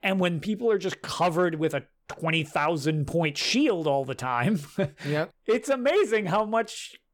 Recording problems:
none

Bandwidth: 18 kHz